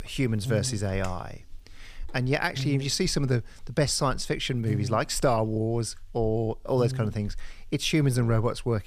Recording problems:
electrical hum; noticeable; throughout; 60 Hz, 15 dB below the speech

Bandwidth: 15 kHz